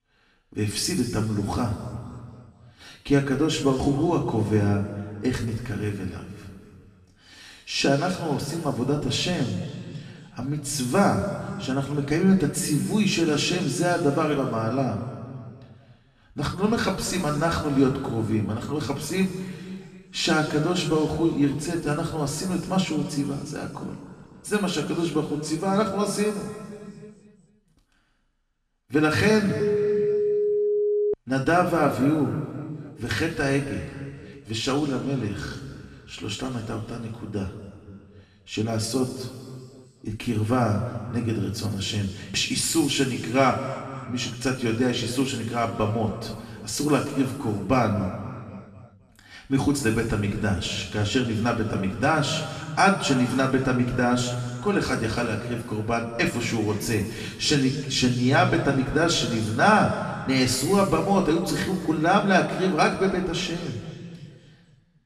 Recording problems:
off-mic speech; far
room echo; noticeable; dies away in 1.9 s
phone ringing; loud; from 30 to 31 s; peak 1 dB above the speech

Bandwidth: 14 kHz